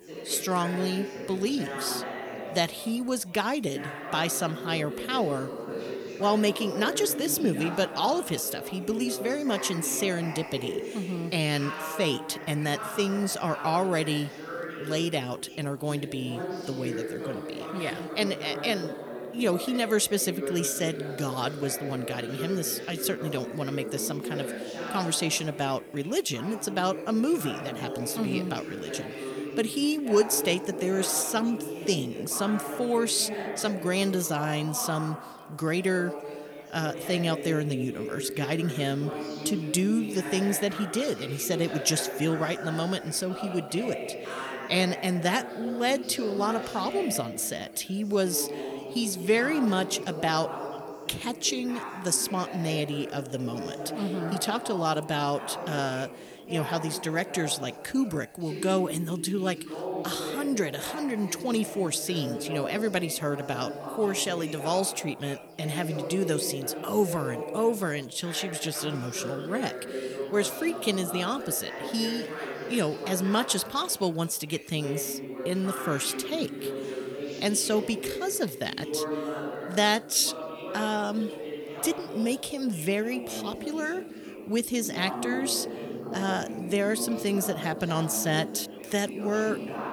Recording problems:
background chatter; loud; throughout; 4 voices, 8 dB below the speech

